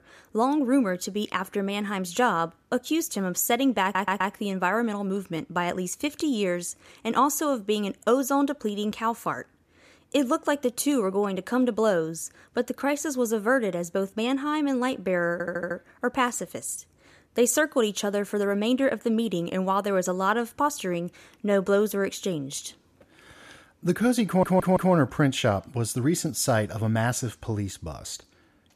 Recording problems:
audio stuttering; at 4 s, at 15 s and at 24 s

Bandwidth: 14.5 kHz